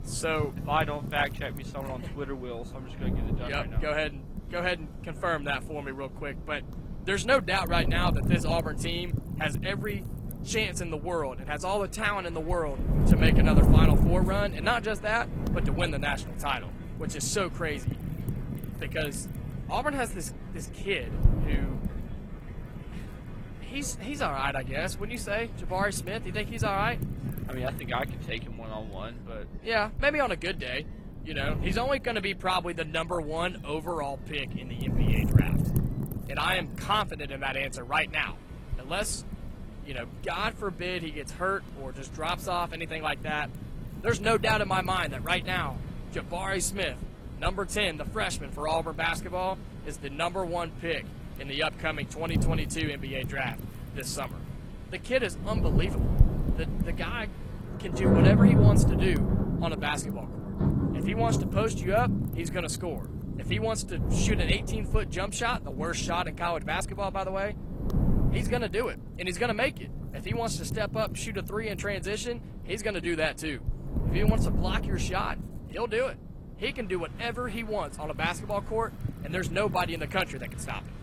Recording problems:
garbled, watery; slightly
rain or running water; very loud; throughout; 2 dB above the speech
wind noise on the microphone; occasional gusts; 15 dB below the speech

